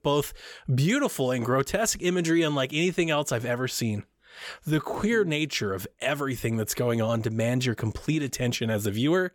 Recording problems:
none

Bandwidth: 17.5 kHz